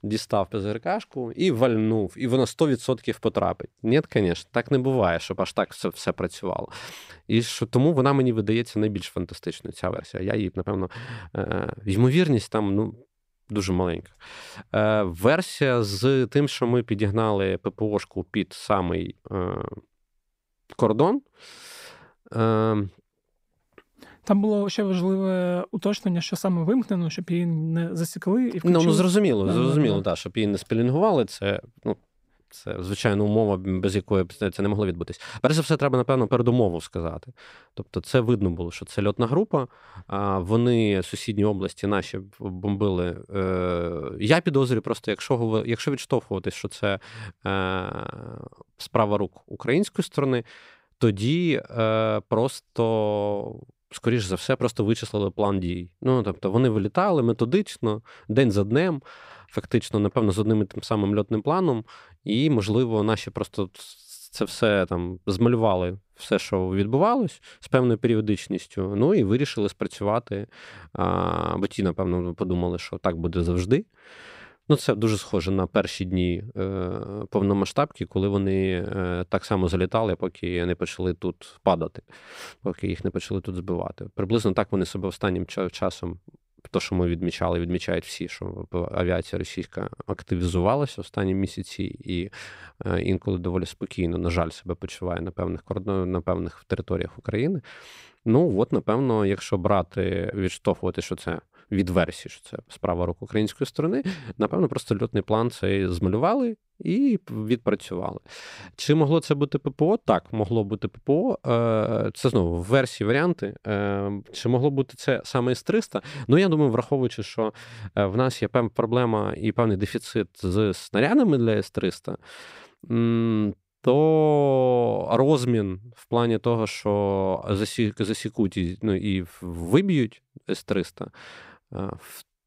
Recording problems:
uneven, jittery; strongly; from 10 s to 1:41

